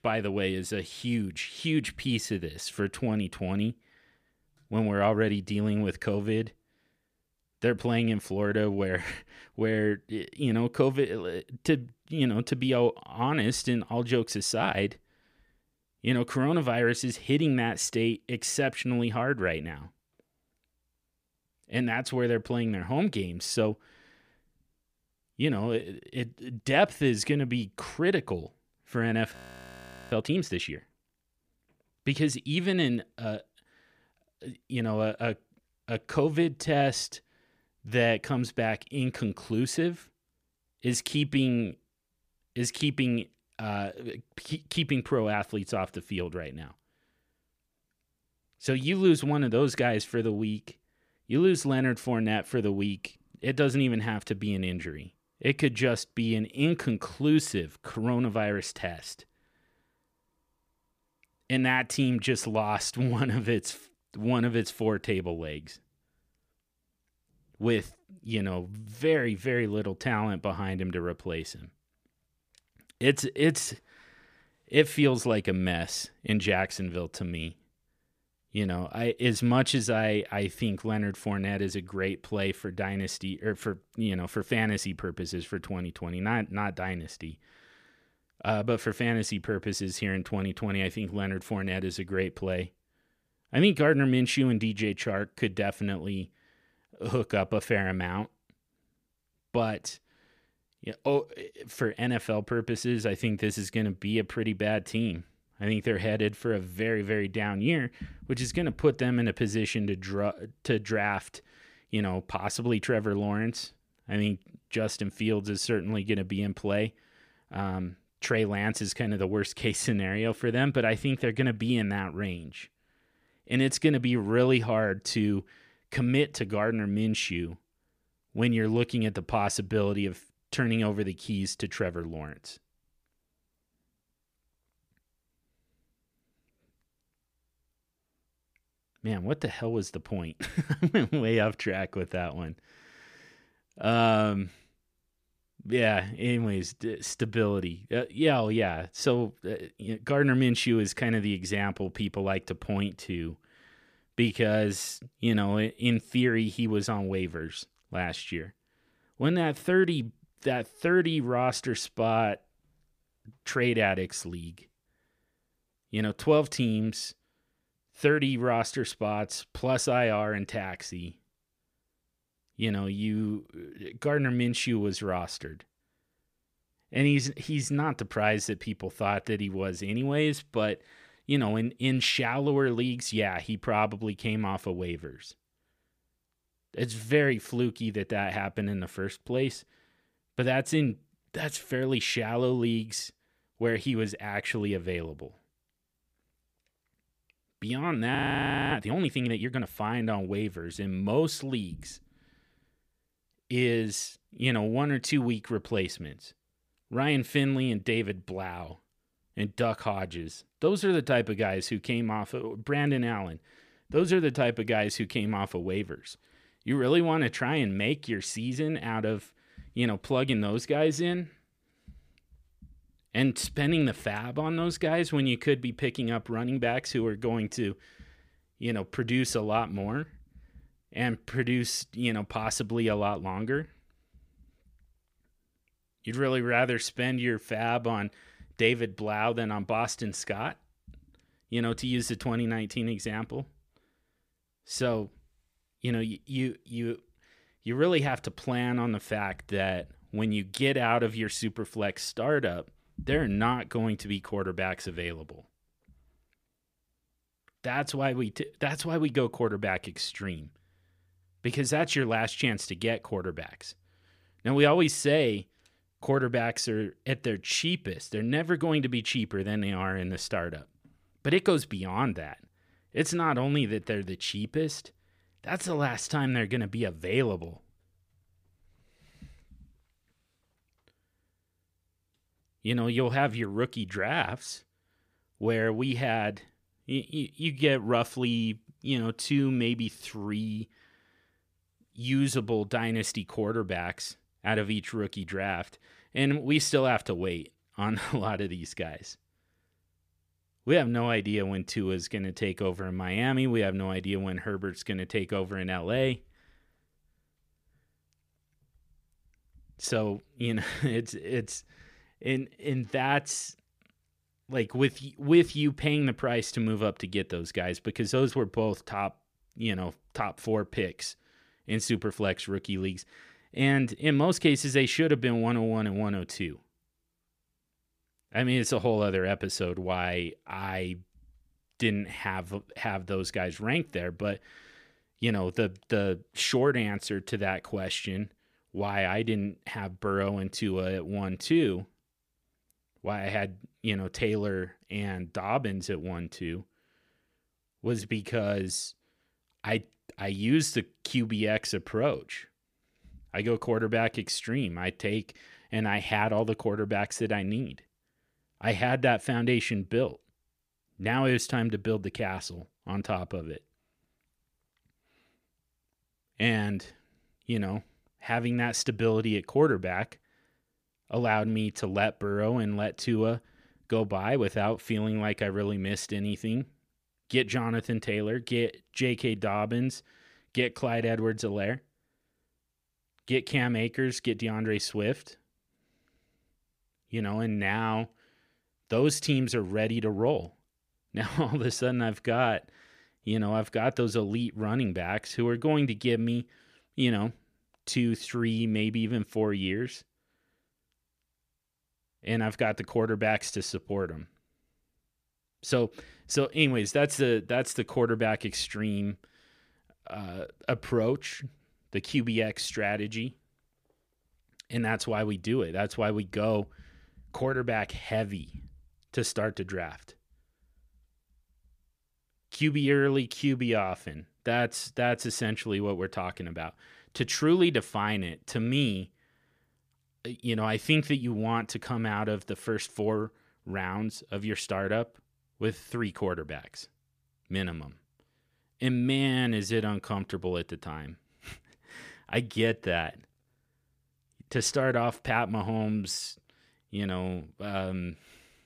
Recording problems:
audio freezing; at 29 s for 1 s and at 3:18 for 0.5 s

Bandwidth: 15 kHz